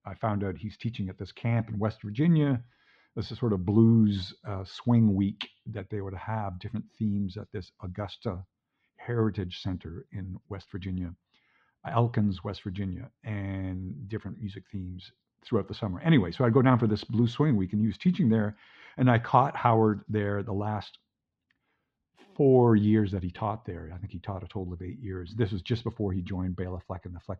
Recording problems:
muffled; slightly; fading above 3.5 kHz

